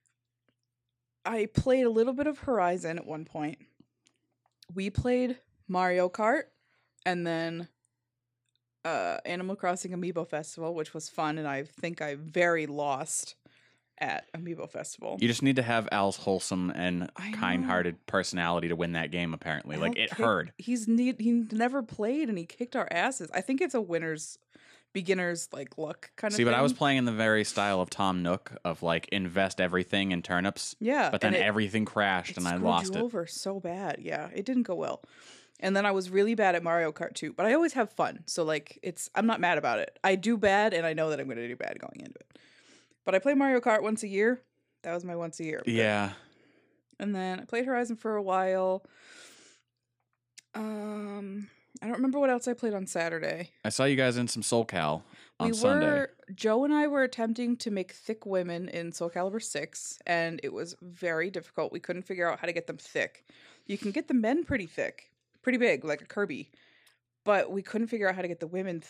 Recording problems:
none

